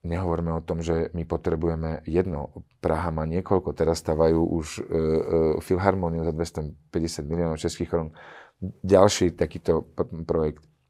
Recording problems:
none

